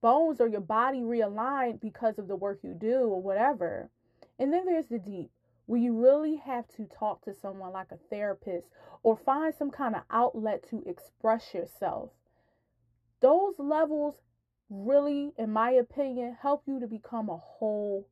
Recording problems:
muffled; very; fading above 2.5 kHz

